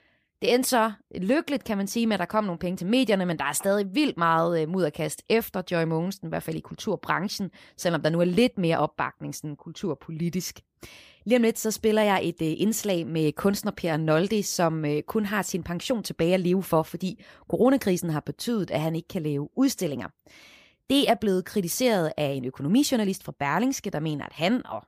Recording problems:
none

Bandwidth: 15 kHz